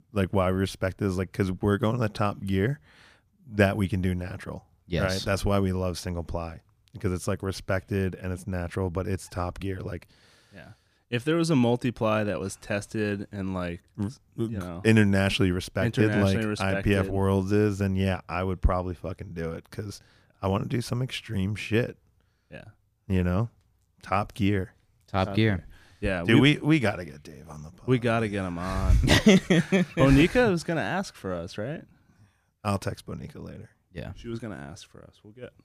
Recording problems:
none

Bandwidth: 15 kHz